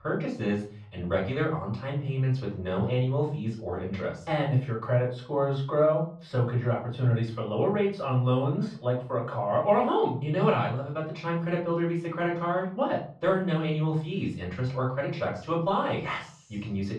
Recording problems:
off-mic speech; far
muffled; very; fading above 3 kHz
room echo; slight; dies away in 0.4 s

